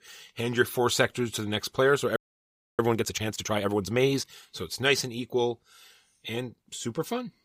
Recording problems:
audio freezing; at 2 s for 0.5 s

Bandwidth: 15.5 kHz